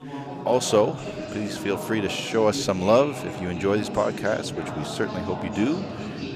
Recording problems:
background chatter; loud; throughout; 4 voices, 8 dB below the speech

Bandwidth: 15 kHz